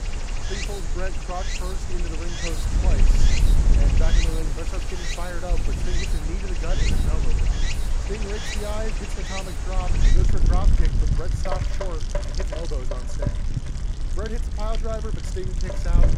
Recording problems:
rain or running water; very loud; throughout; 2 dB above the speech
wind noise on the microphone; heavy; 7 dB below the speech

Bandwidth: 16 kHz